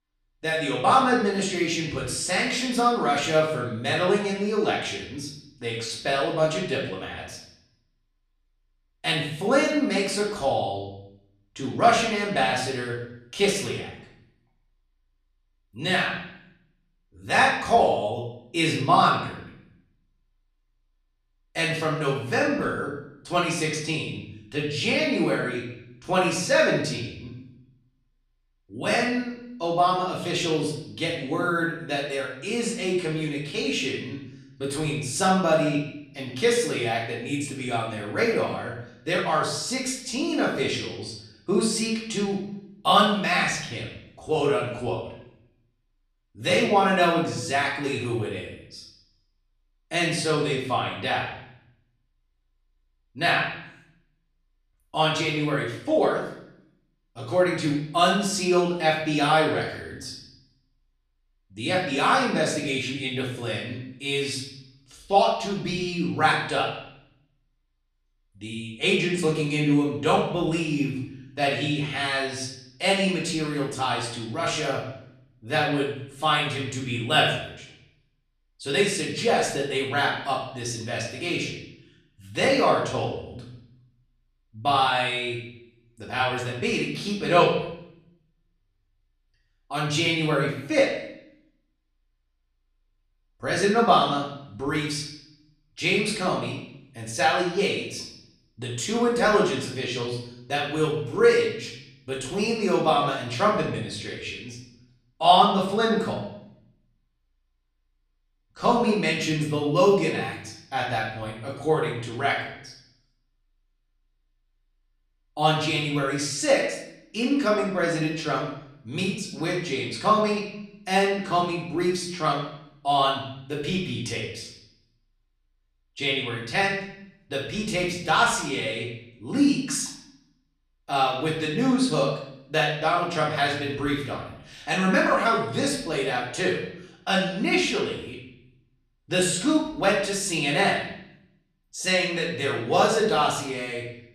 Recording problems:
off-mic speech; far
room echo; noticeable; dies away in 0.7 s

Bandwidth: 14 kHz